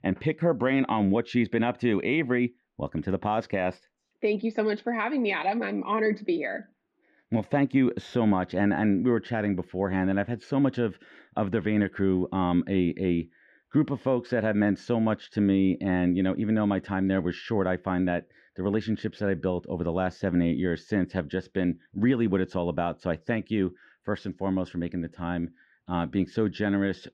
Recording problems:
muffled; slightly; fading above 3 kHz

